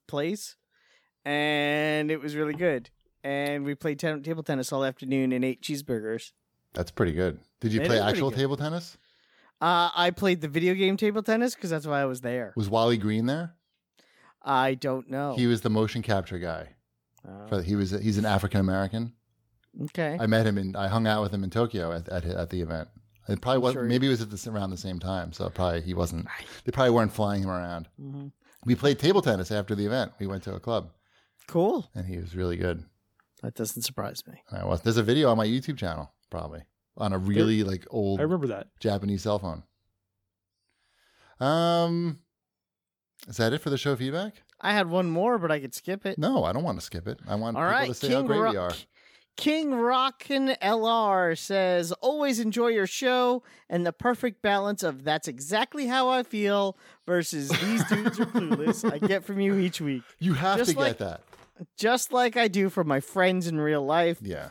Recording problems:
none

